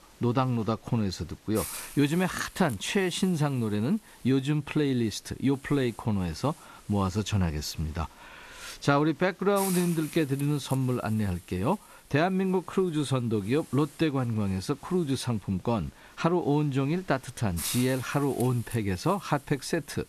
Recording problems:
hiss; noticeable; throughout; 15 dB below the speech

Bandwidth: 13.5 kHz